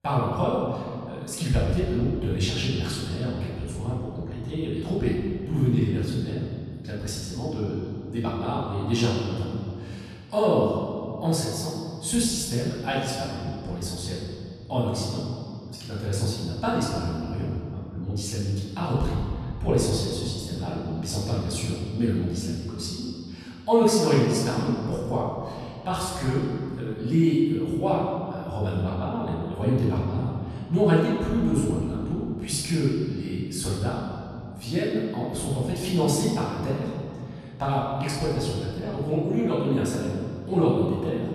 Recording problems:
room echo; strong; dies away in 2.2 s
off-mic speech; far

